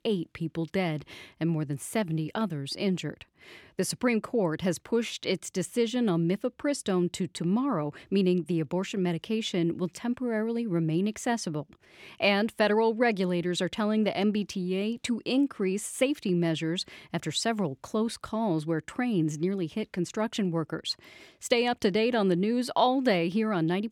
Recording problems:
none

